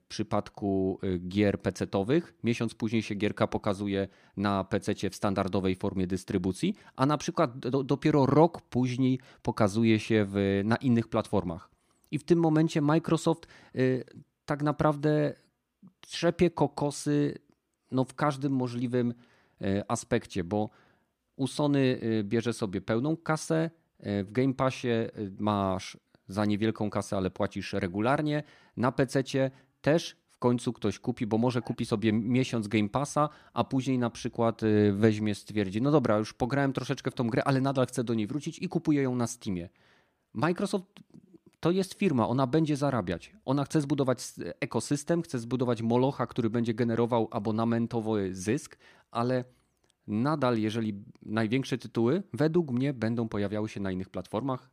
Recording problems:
none

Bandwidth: 15 kHz